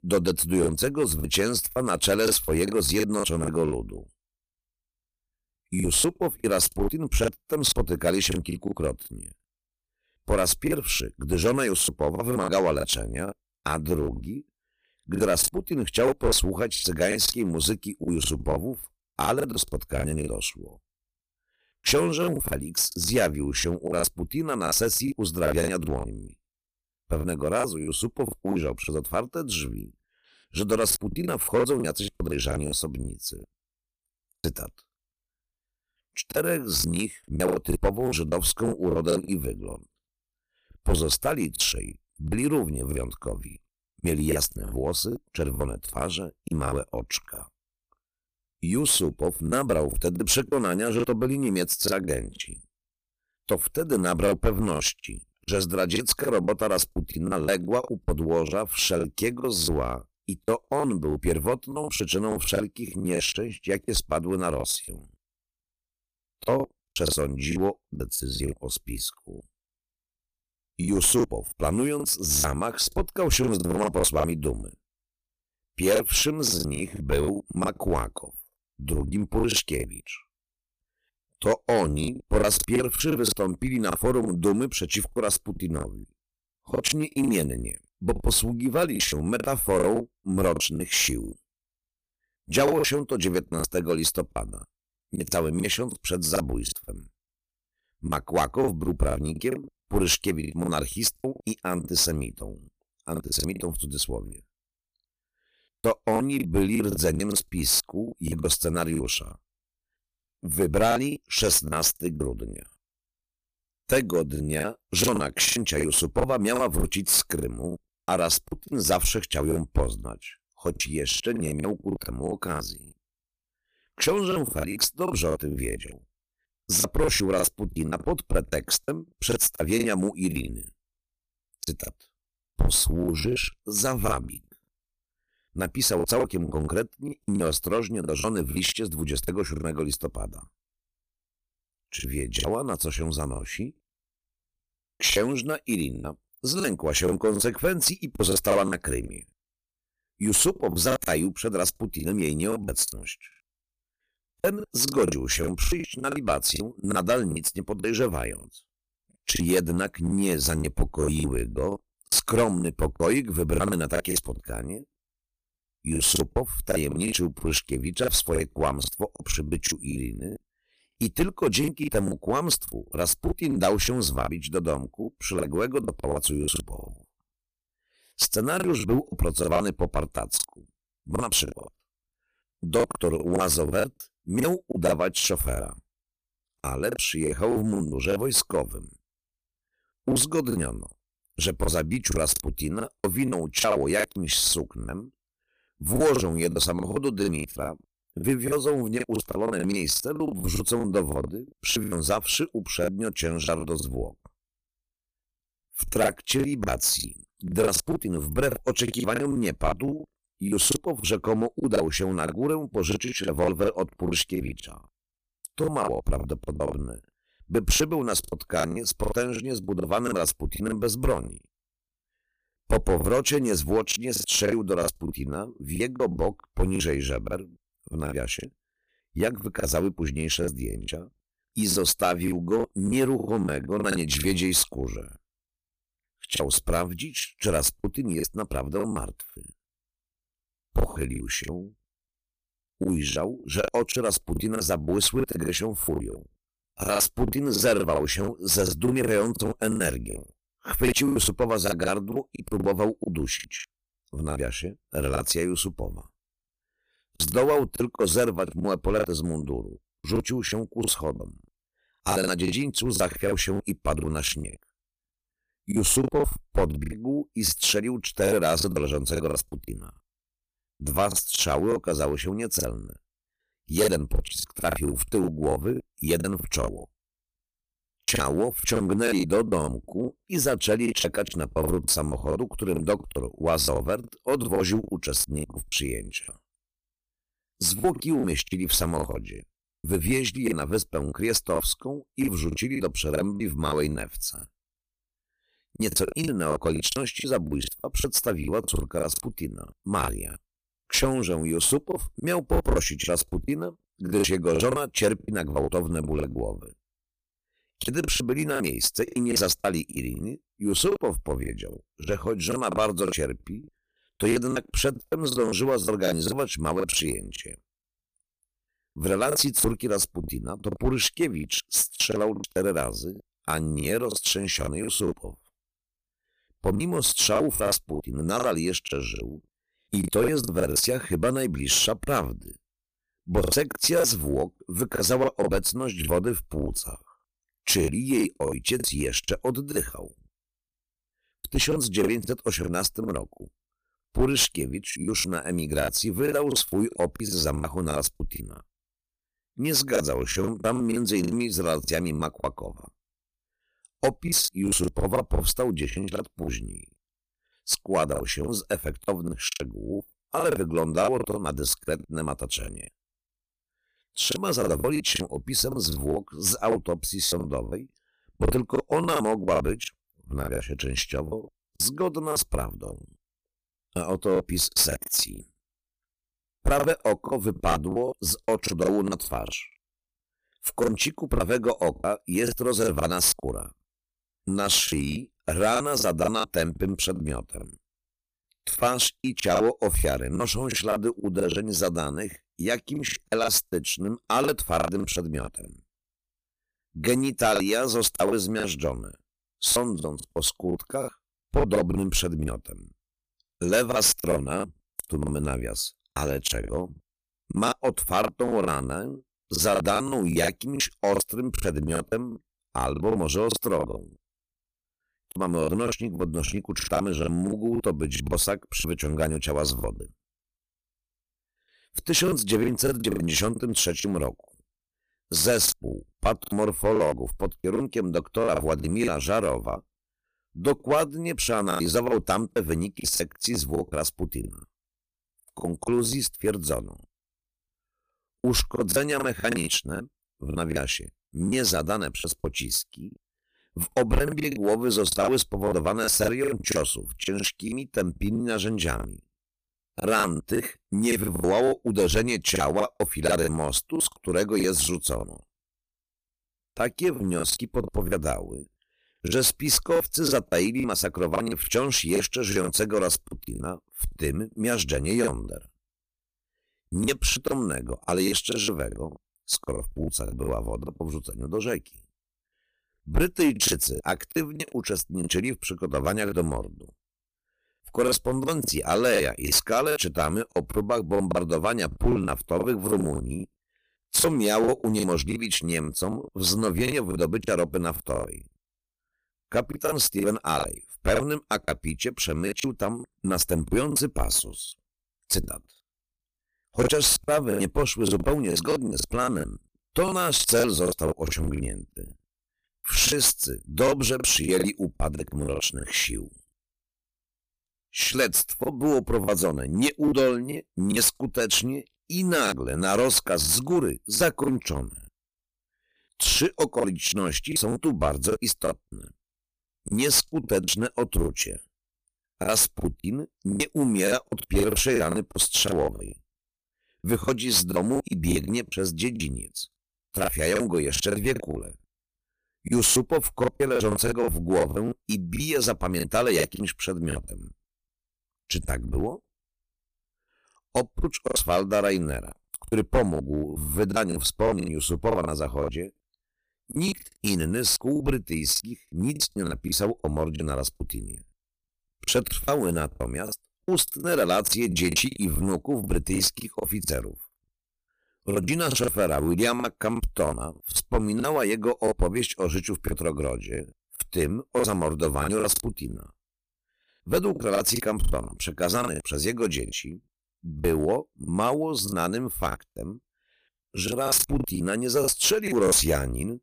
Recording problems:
distortion; slight; 3% of the sound clipped
choppy; very; 13% of the speech affected

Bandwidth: 15 kHz